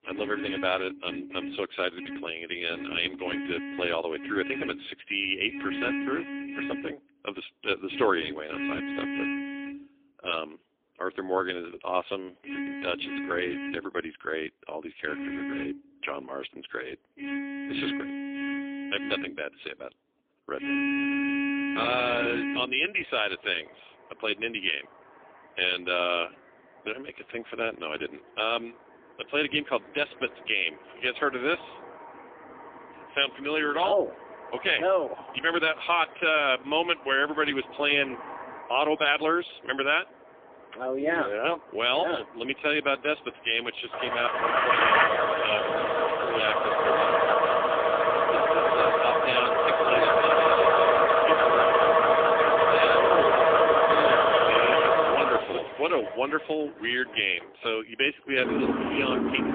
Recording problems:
phone-call audio; poor line; nothing above 3.5 kHz
traffic noise; very loud; throughout; 4 dB above the speech

